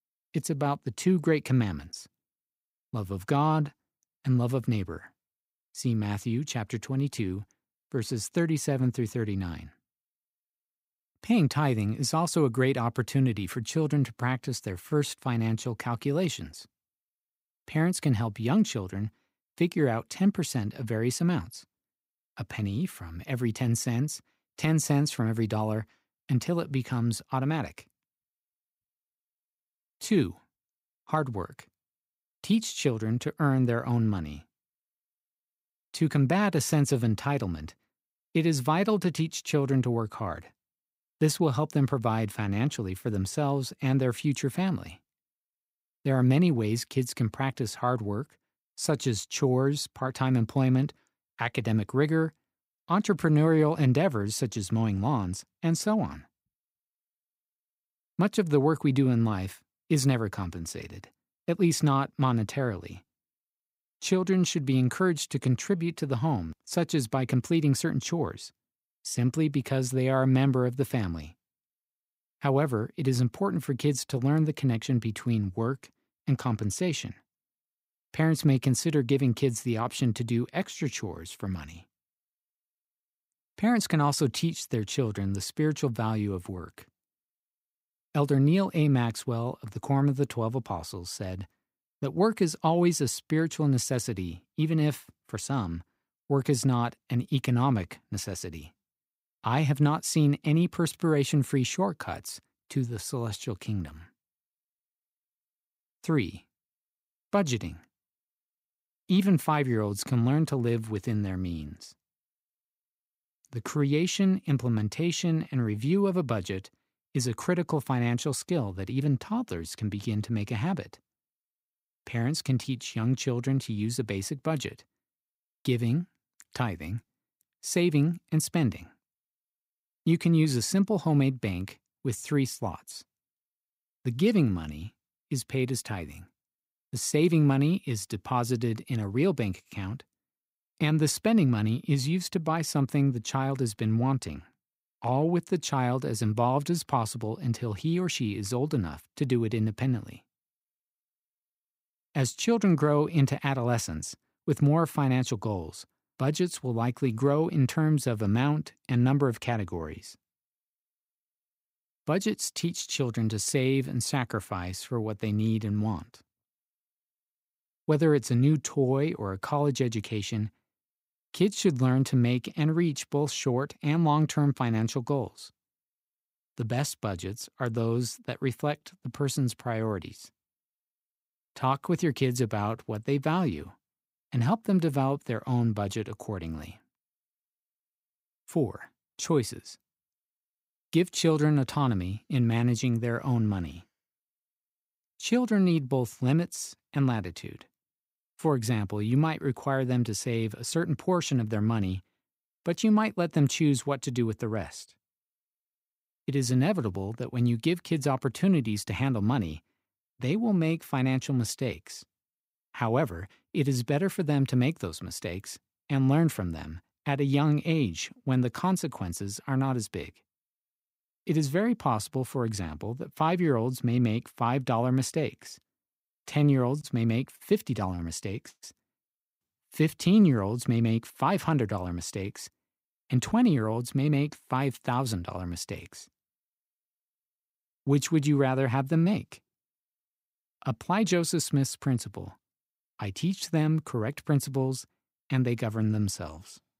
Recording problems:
none

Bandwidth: 15.5 kHz